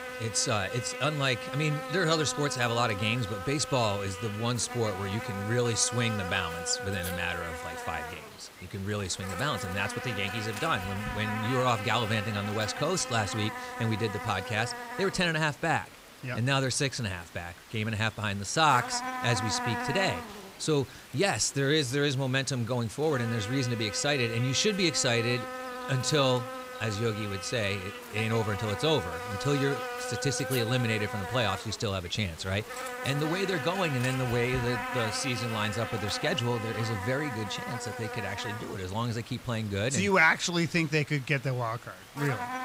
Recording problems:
electrical hum; loud; throughout; 50 Hz, 6 dB below the speech

